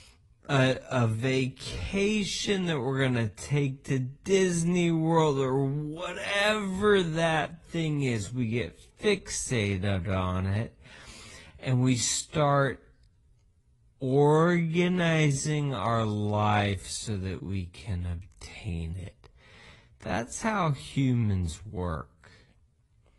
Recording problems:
wrong speed, natural pitch; too slow; 0.5 times normal speed
garbled, watery; slightly; nothing above 10.5 kHz

